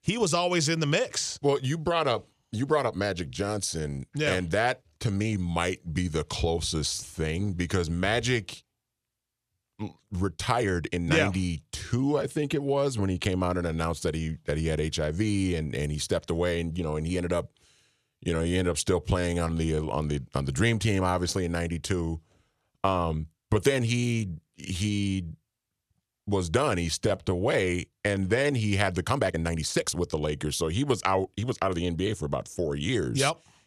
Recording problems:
uneven, jittery; strongly; from 1.5 to 32 s

